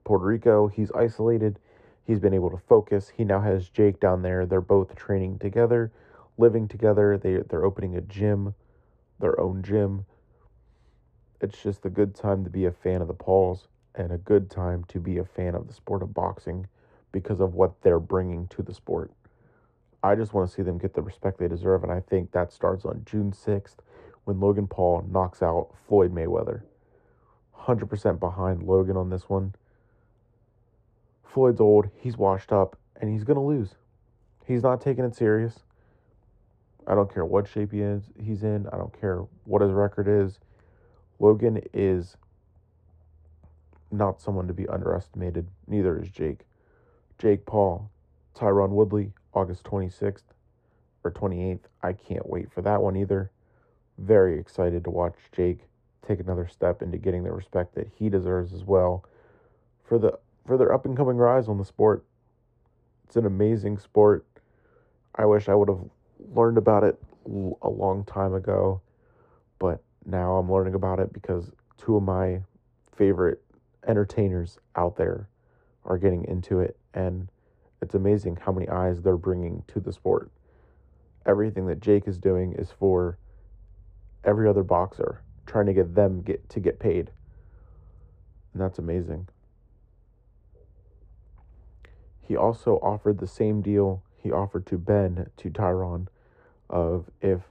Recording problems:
muffled; very; fading above 1.5 kHz

